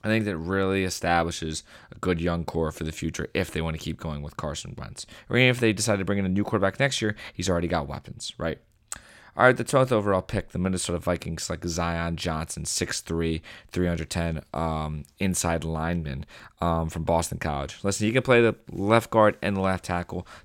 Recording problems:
none

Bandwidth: 16.5 kHz